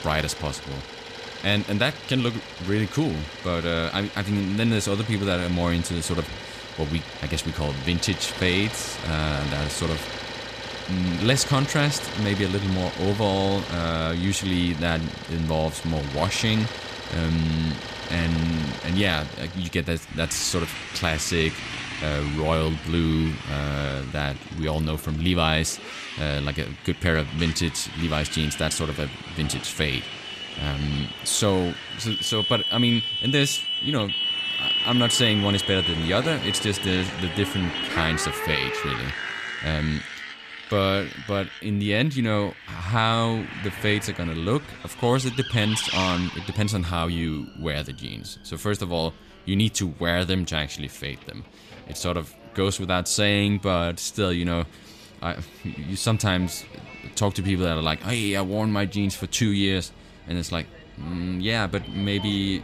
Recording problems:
traffic noise; loud; throughout; 6 dB below the speech
background music; faint; throughout; 25 dB below the speech

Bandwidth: 14.5 kHz